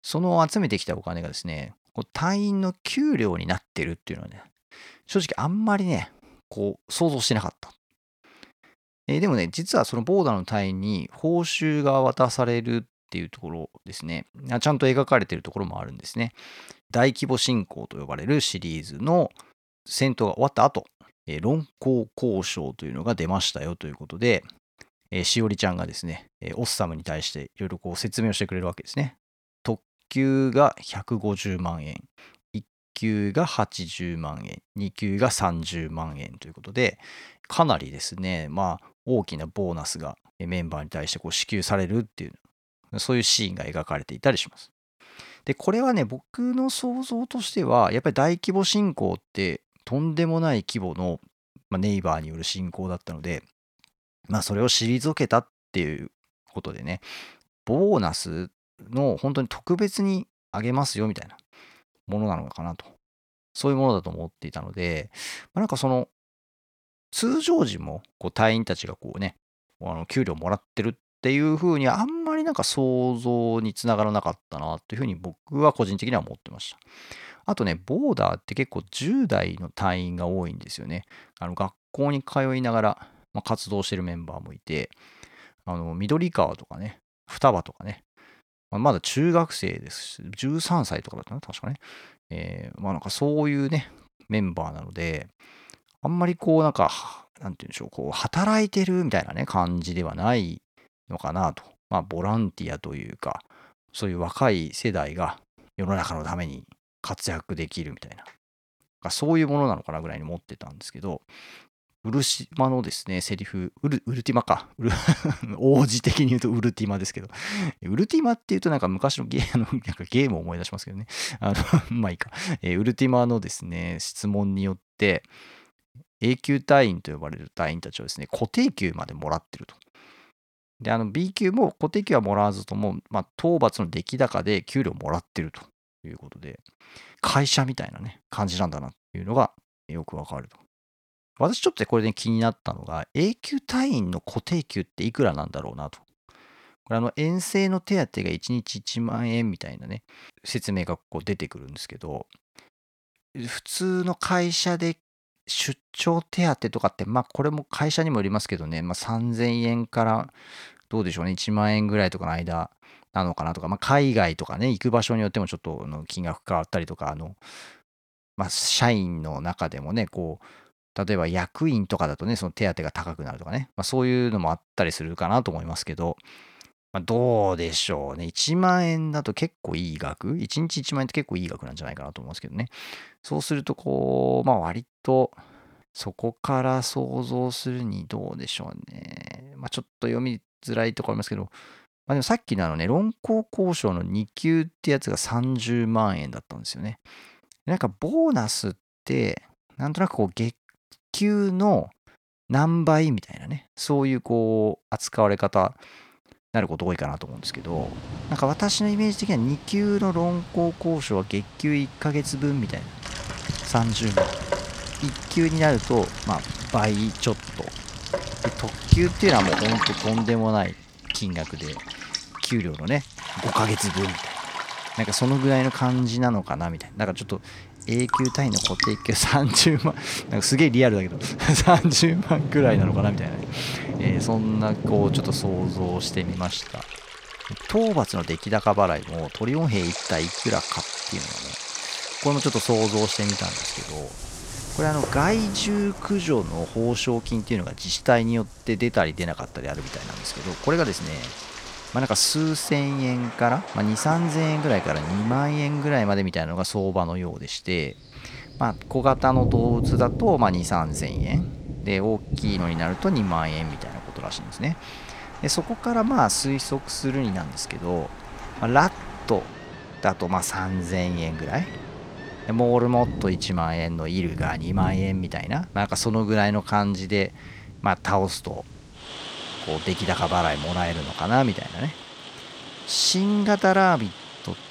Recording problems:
rain or running water; loud; from 3:28 on; 7 dB below the speech

